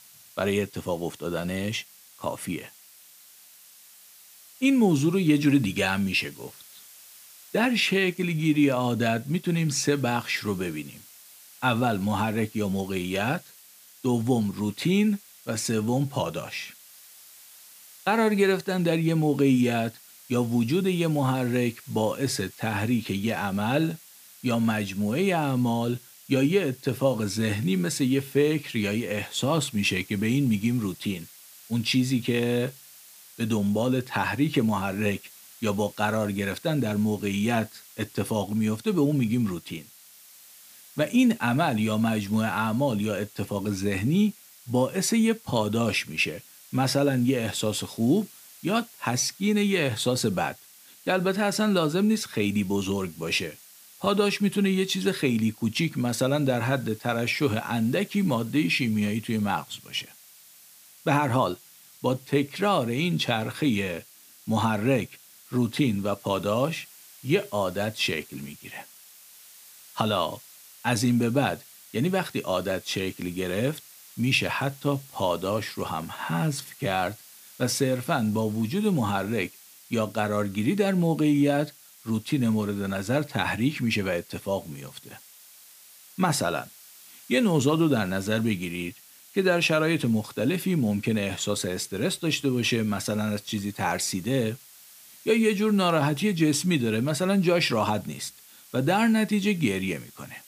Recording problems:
hiss; faint; throughout; 20 dB below the speech

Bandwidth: 15 kHz